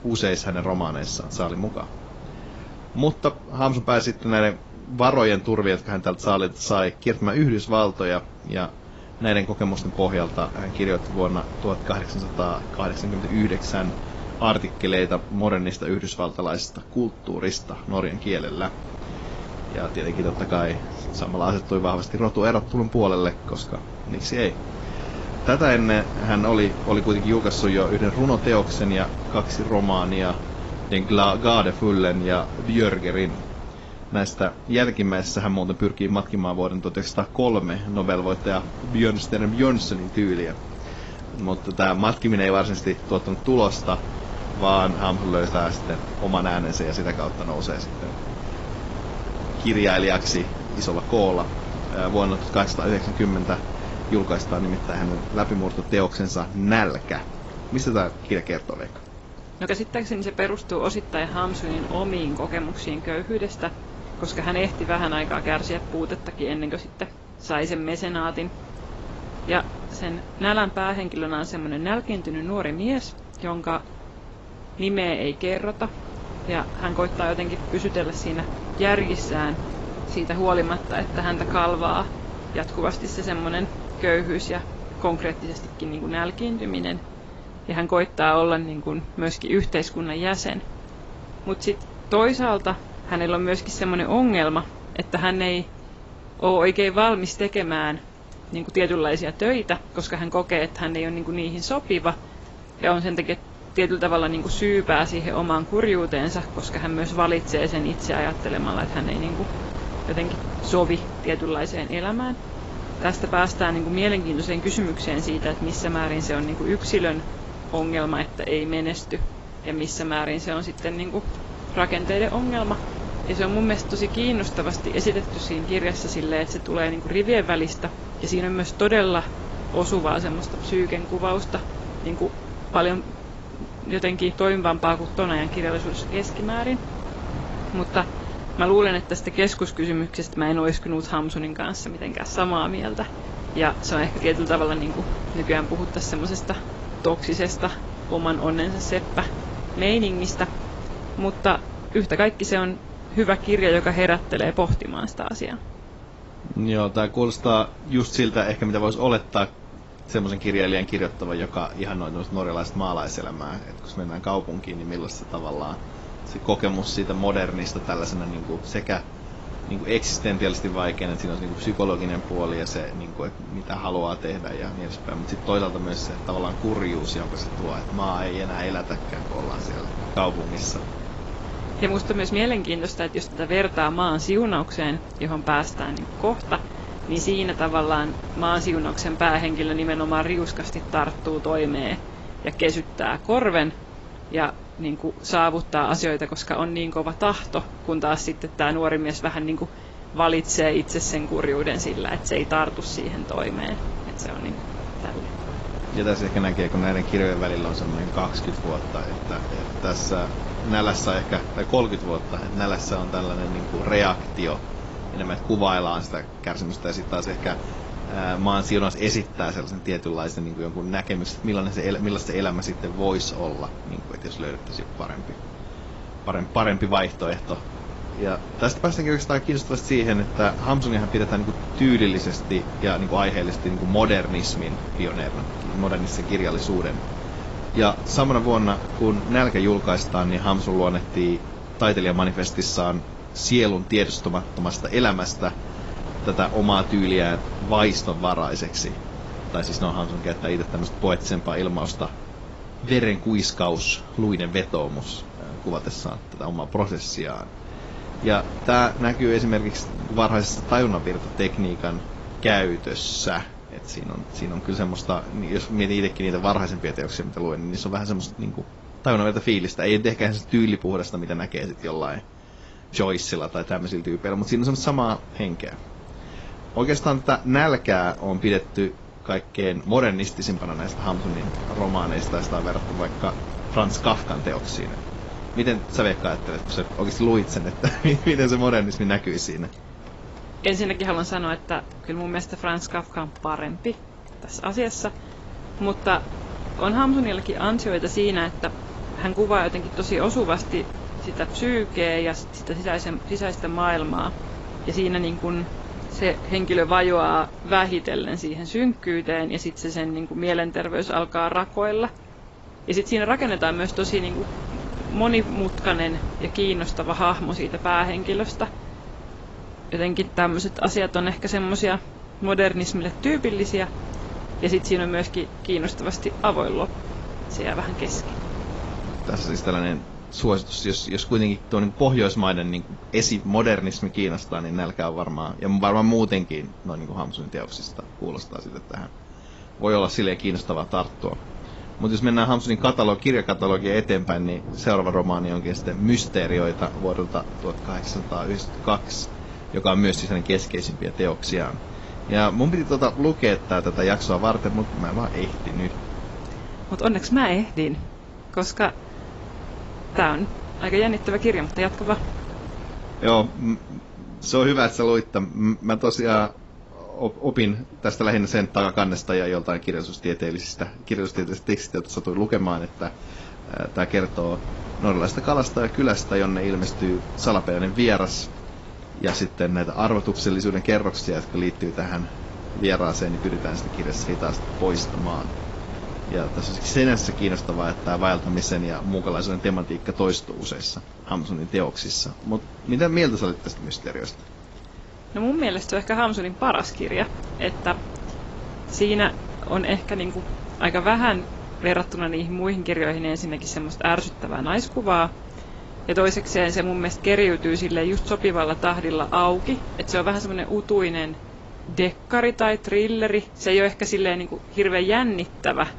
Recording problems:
garbled, watery; badly; nothing above 7.5 kHz
wind noise on the microphone; occasional gusts; 15 dB below the speech
rain or running water; faint; throughout; 25 dB below the speech

